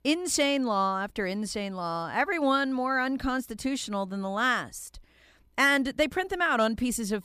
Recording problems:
none

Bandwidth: 15 kHz